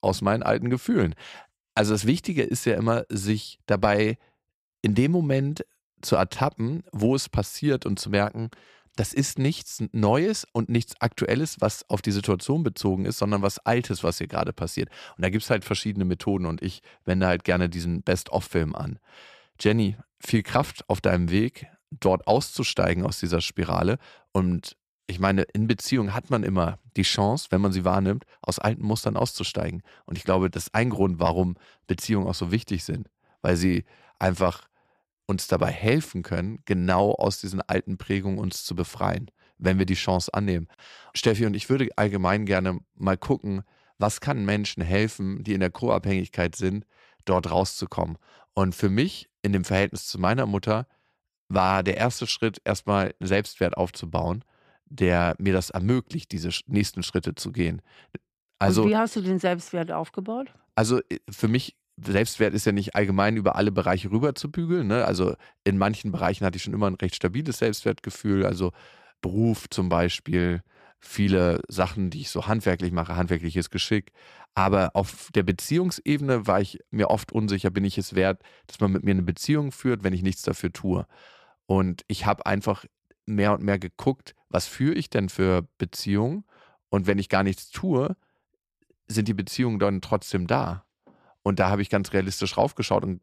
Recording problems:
none

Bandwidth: 14.5 kHz